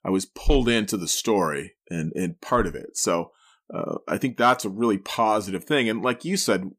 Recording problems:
none

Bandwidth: 15 kHz